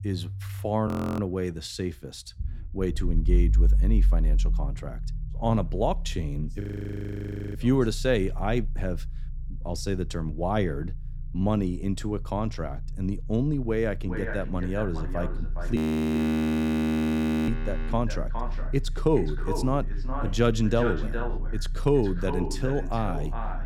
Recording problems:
echo of what is said; strong; from 14 s on; 410 ms later, 9 dB below the speech
low rumble; faint; throughout; 20 dB below the speech
audio freezing; at 1 s, at 6.5 s for 1 s and at 16 s for 1.5 s

